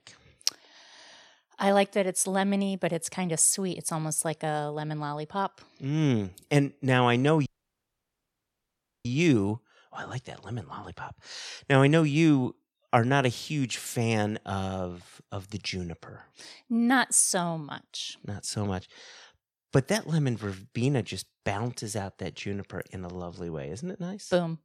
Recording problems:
audio cutting out; at 7.5 s for 1.5 s

